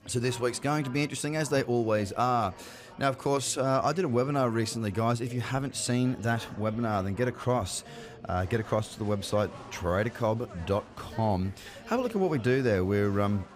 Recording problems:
chatter from many people; noticeable; throughout; 20 dB below the speech

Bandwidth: 15 kHz